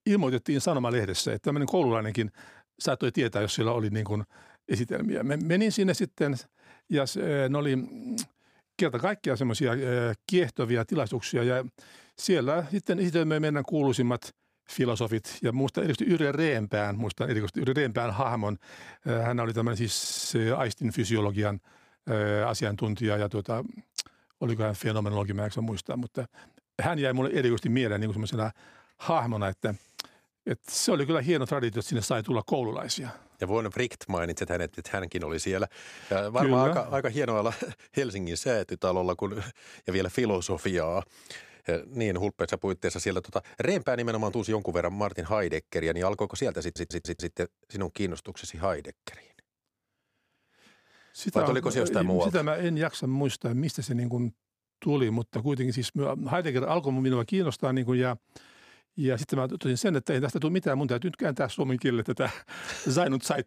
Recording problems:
audio stuttering; at 20 s and at 47 s

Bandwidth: 15 kHz